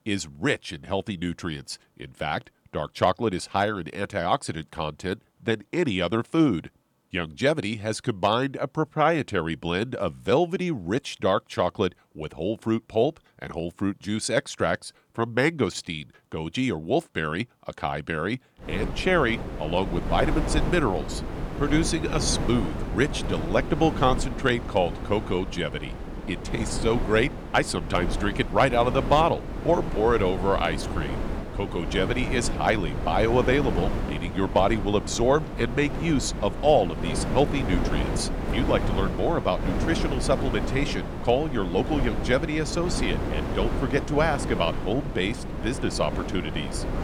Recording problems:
wind noise on the microphone; heavy; from 19 s on; 9 dB below the speech

